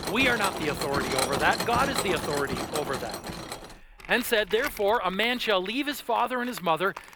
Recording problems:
machinery noise; loud; throughout; 5 dB below the speech

